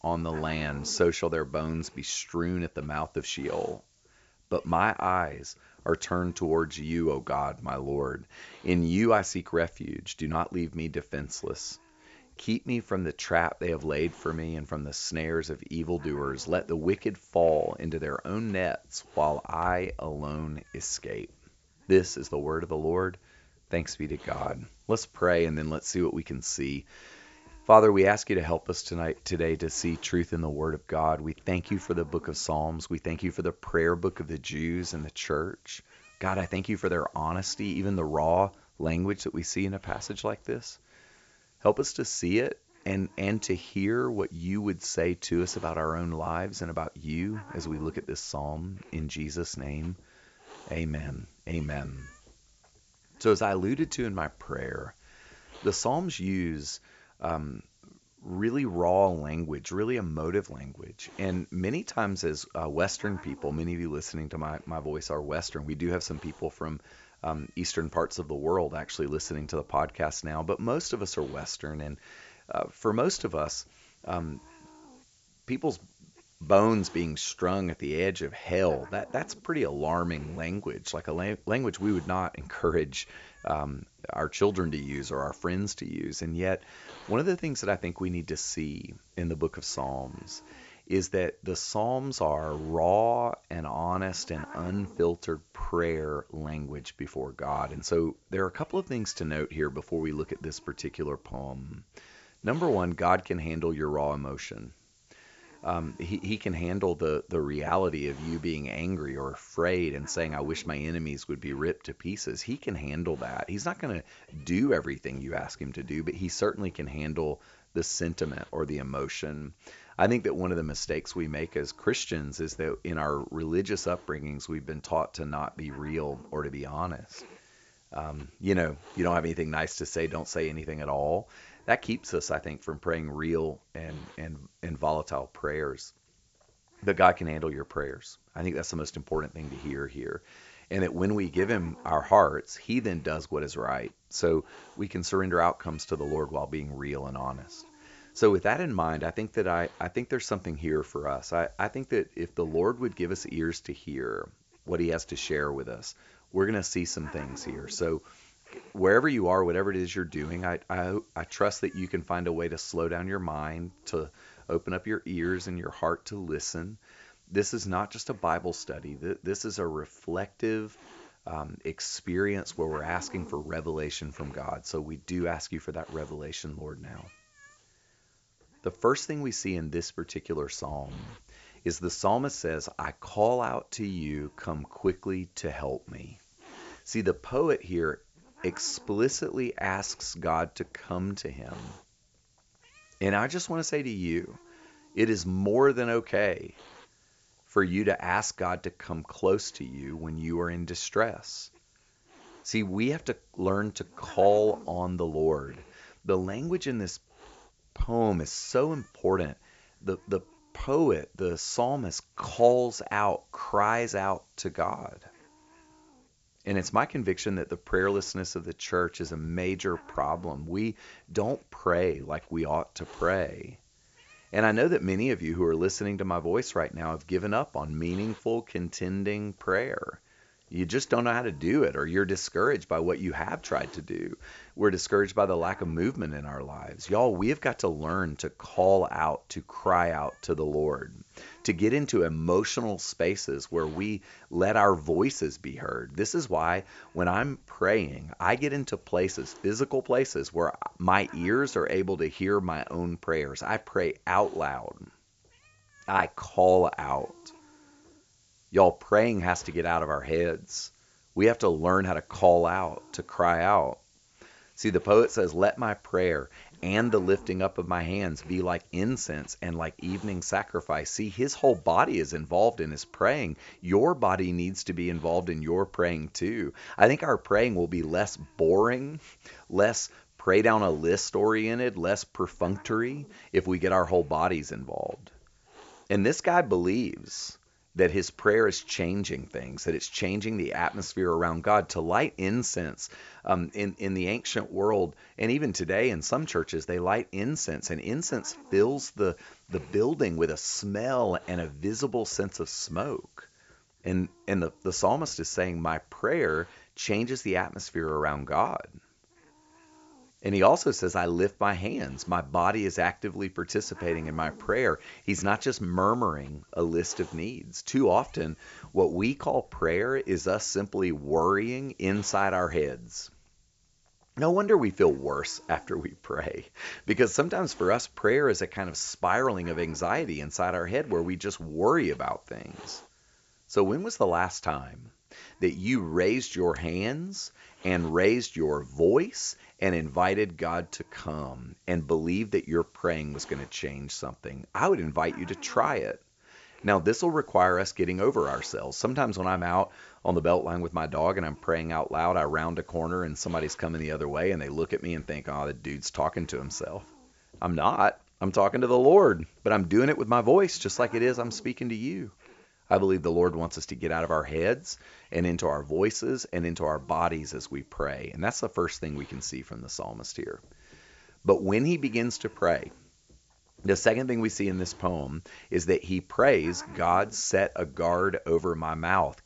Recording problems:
high frequencies cut off; noticeable; nothing above 8 kHz
hiss; faint; throughout; 25 dB below the speech

